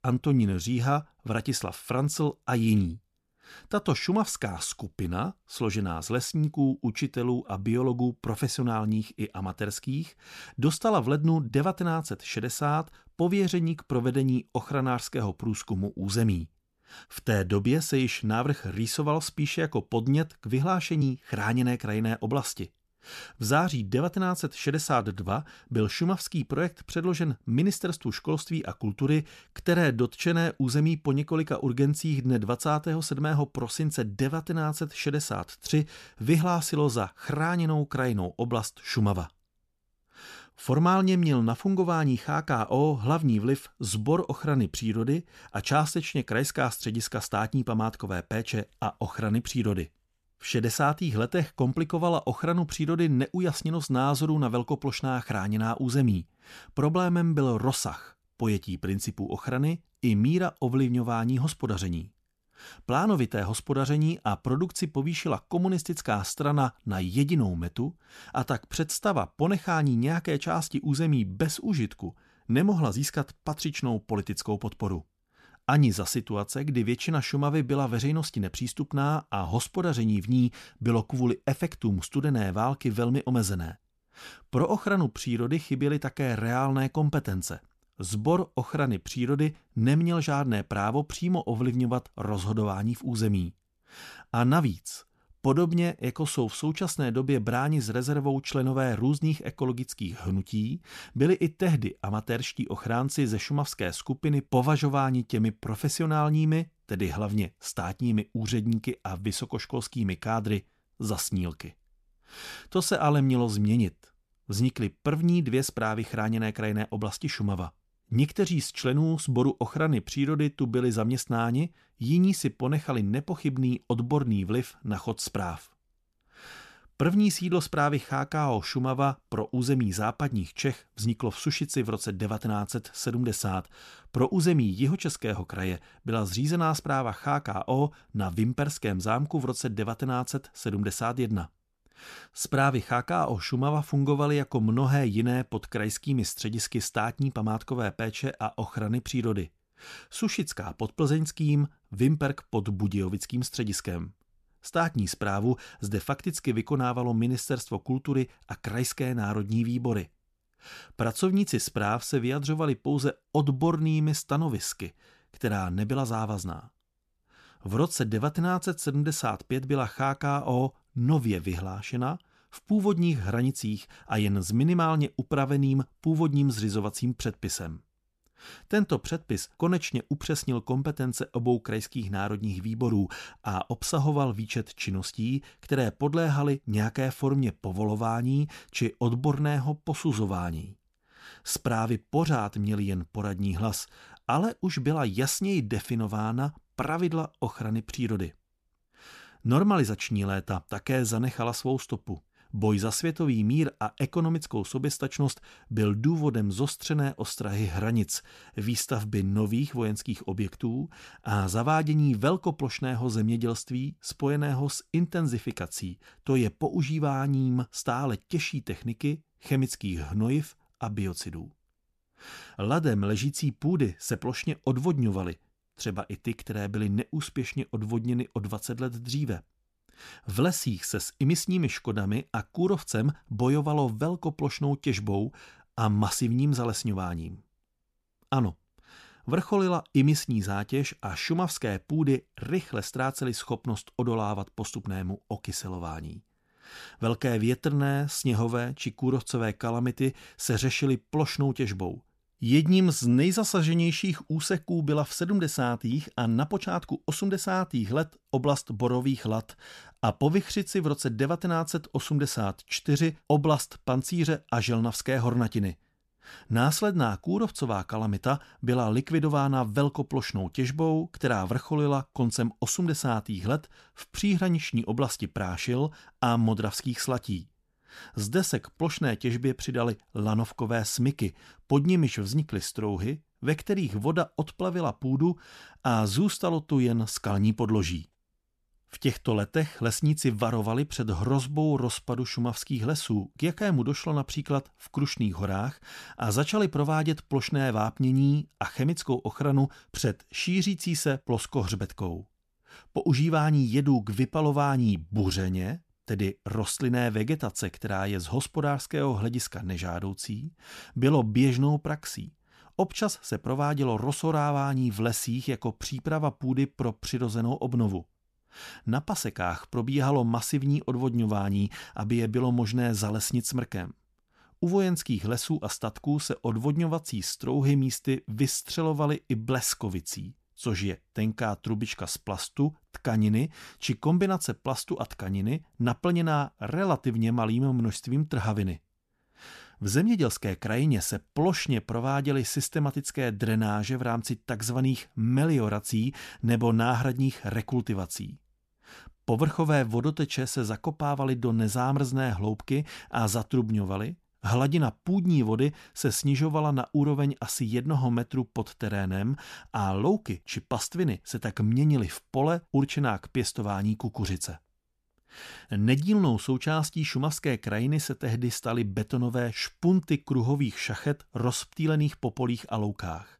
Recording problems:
none

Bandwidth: 14 kHz